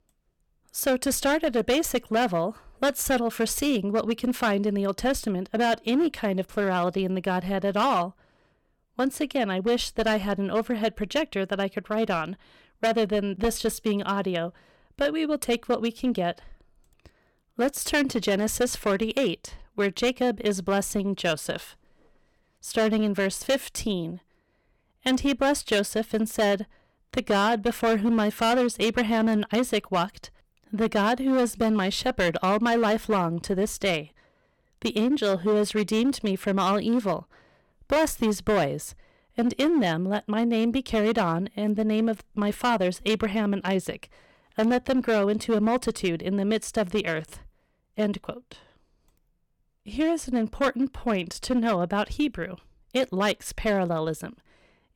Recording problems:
distortion; slight; 7% of the sound clipped

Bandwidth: 18 kHz